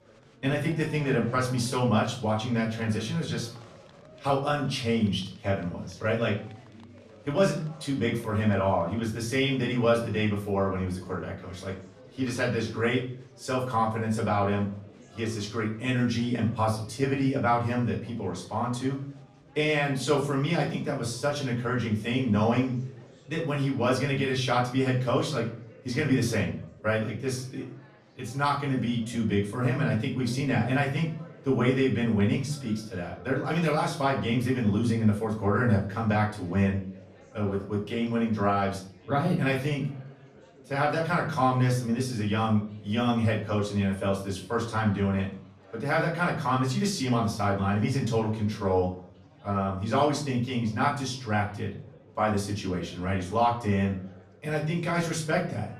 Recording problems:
off-mic speech; far
room echo; slight; dies away in 0.4 s
chatter from many people; faint; throughout; 25 dB below the speech

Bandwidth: 14.5 kHz